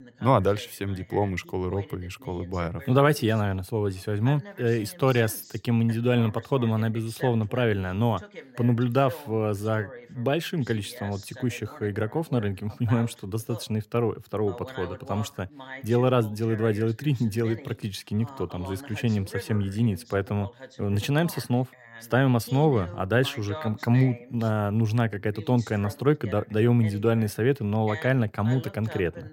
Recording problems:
voice in the background; noticeable; throughout; 15 dB below the speech

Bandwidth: 16 kHz